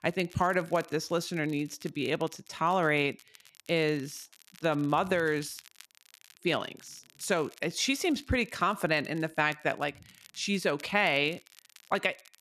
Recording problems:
crackle, like an old record; faint; 25 dB below the speech

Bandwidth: 13.5 kHz